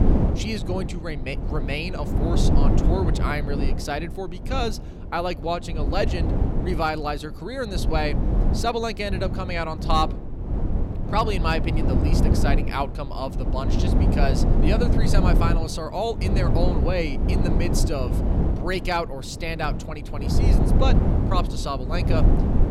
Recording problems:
wind noise on the microphone; heavy; 5 dB below the speech

